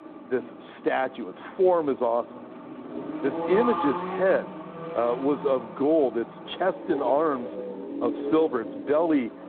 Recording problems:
phone-call audio
traffic noise; loud; throughout; 9 dB below the speech

